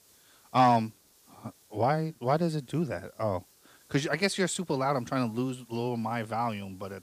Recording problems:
hiss; faint; throughout; 30 dB below the speech

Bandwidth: 15 kHz